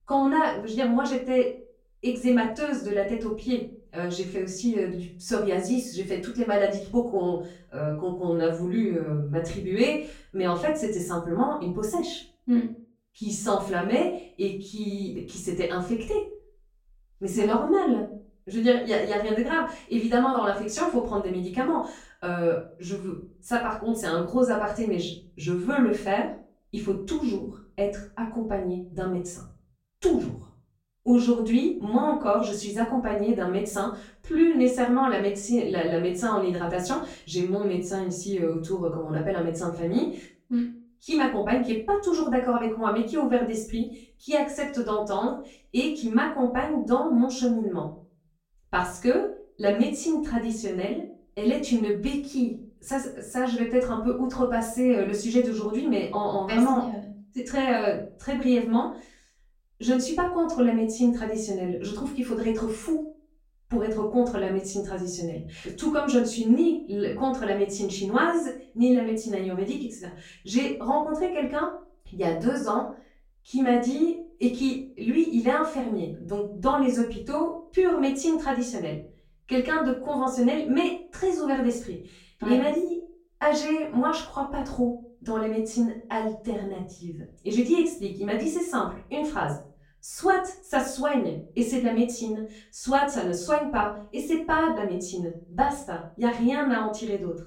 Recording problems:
off-mic speech; far
room echo; slight; dies away in 0.4 s

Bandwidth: 16 kHz